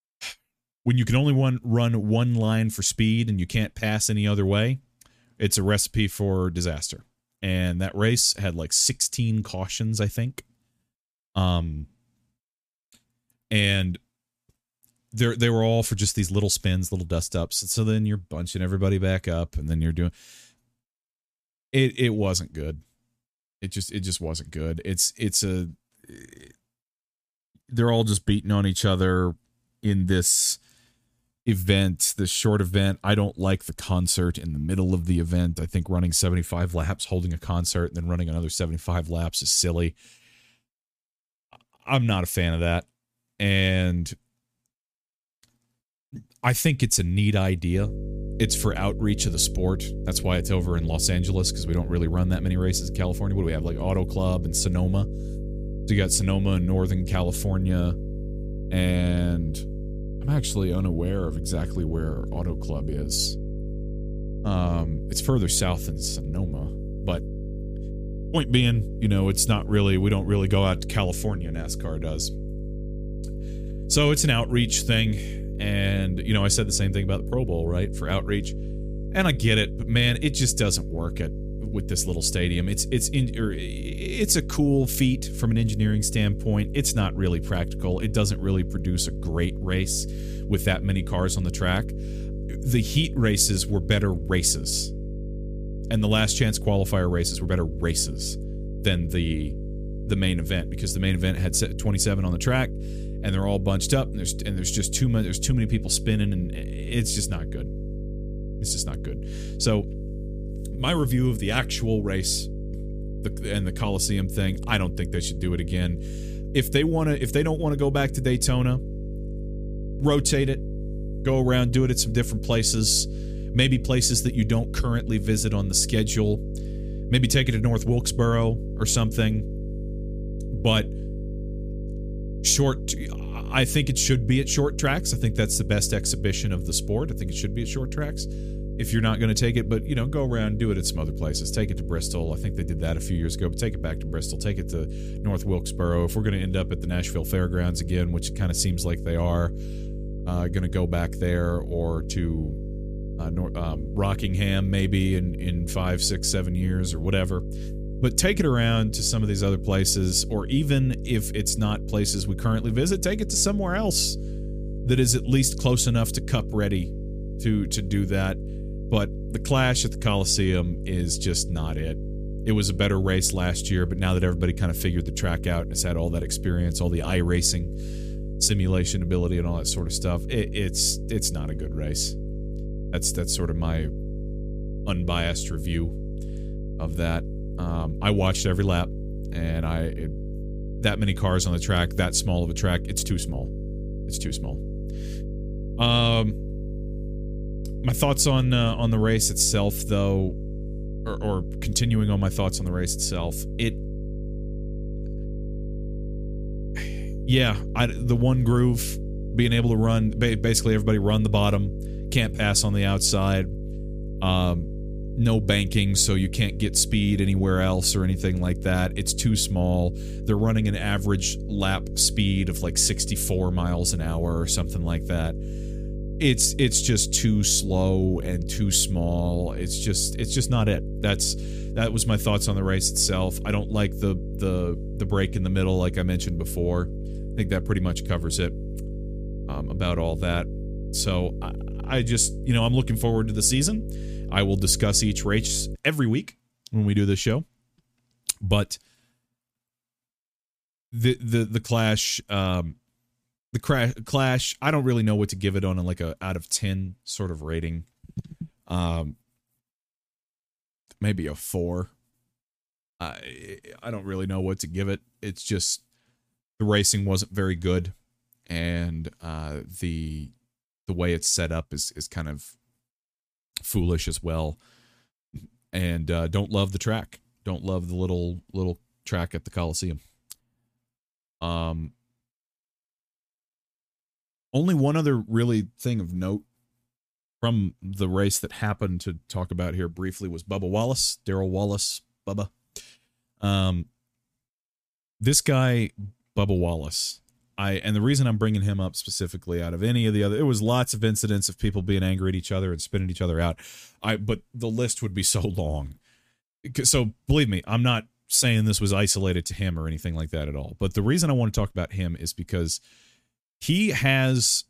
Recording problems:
electrical hum; noticeable; from 48 s to 4:06; 50 Hz, 15 dB below the speech

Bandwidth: 15 kHz